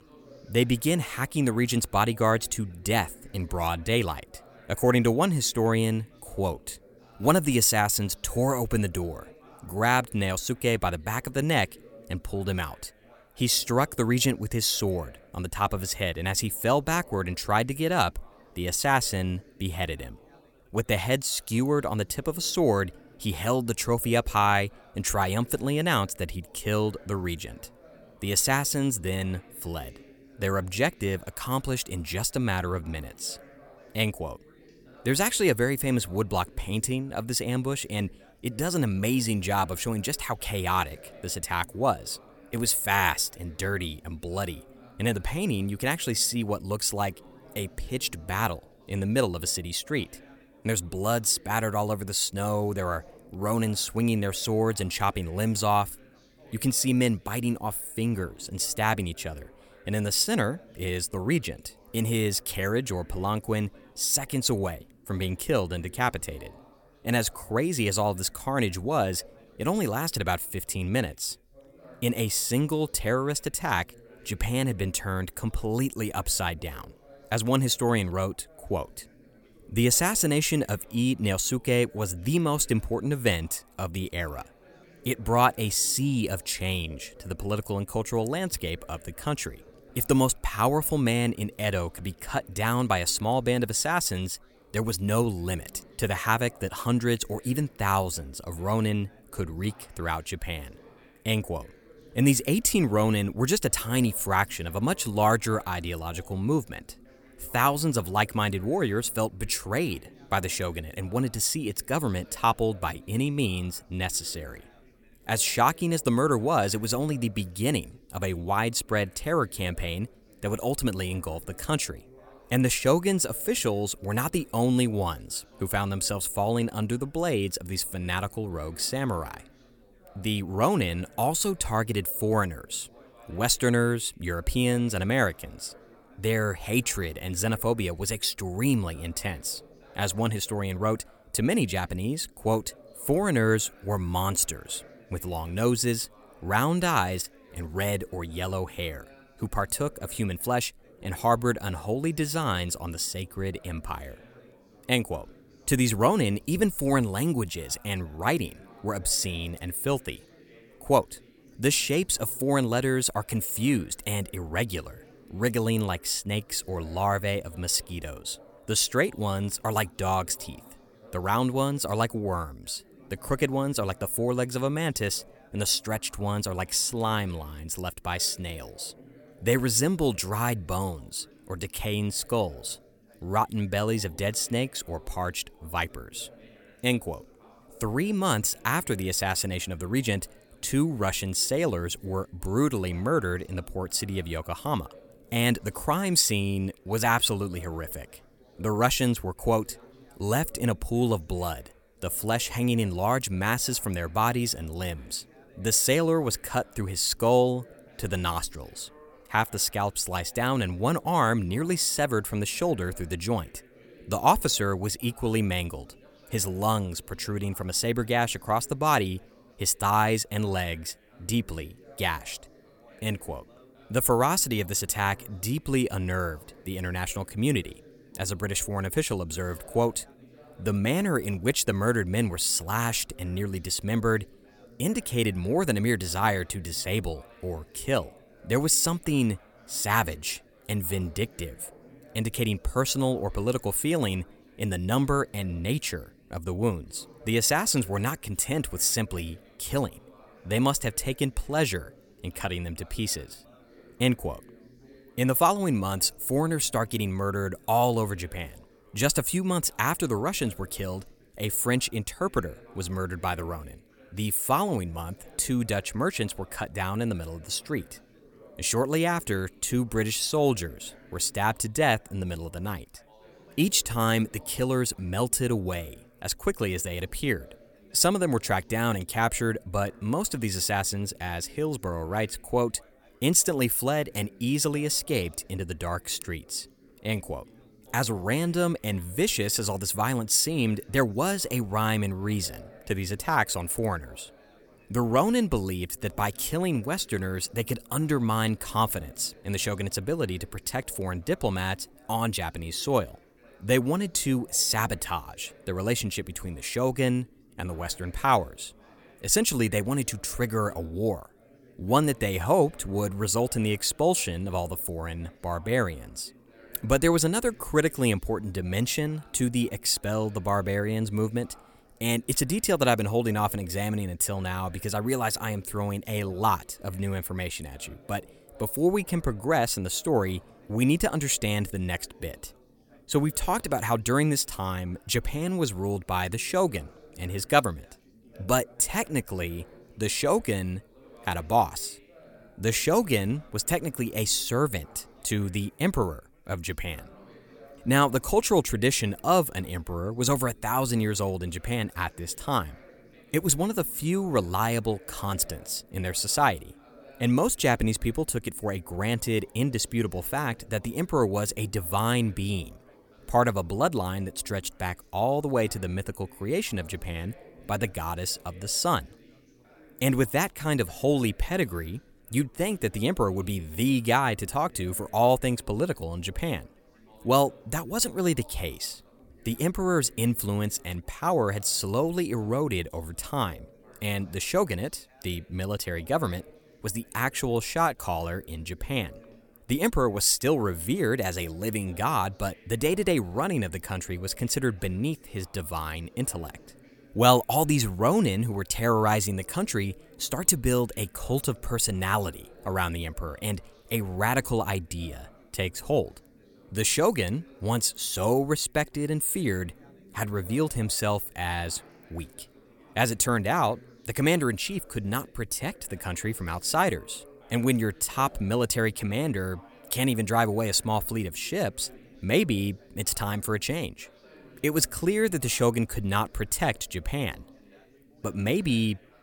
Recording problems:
background chatter; faint; throughout; 4 voices, 25 dB below the speech

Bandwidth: 18 kHz